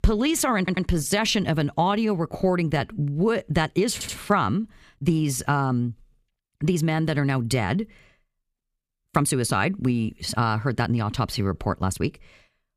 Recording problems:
audio stuttering; at 0.5 s and at 4 s
uneven, jittery; strongly; from 1 to 12 s

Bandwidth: 15 kHz